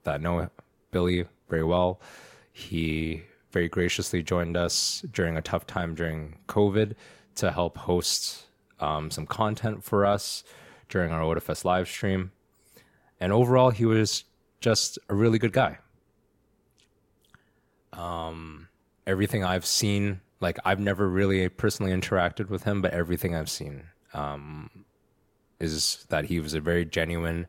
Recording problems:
none

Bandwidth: 16.5 kHz